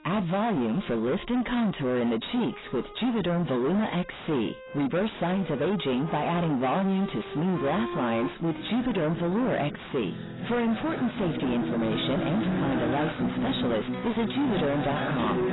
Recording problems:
distortion; heavy; 6 dB below the speech
garbled, watery; badly; nothing above 4 kHz
background music; loud; throughout; 4 dB below the speech

